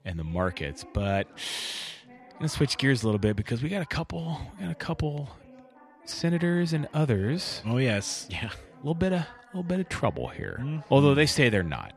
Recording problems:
background chatter; faint; throughout; 2 voices, 25 dB below the speech

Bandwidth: 14 kHz